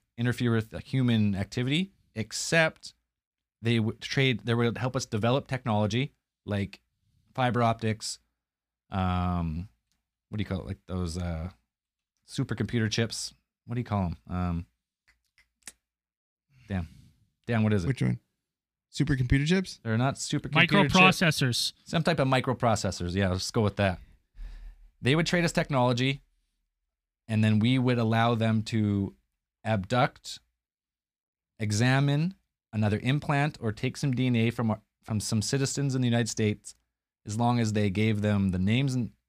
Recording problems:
none

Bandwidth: 15 kHz